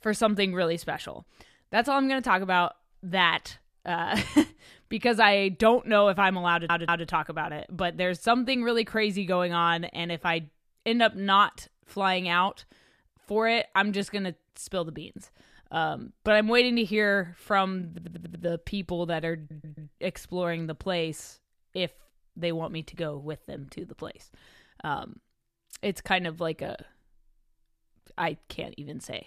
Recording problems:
audio stuttering; at 6.5 s, at 18 s and at 19 s

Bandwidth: 14.5 kHz